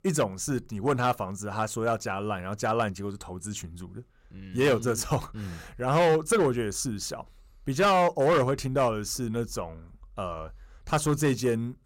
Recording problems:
distortion; slight; 5% of the sound clipped

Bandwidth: 16 kHz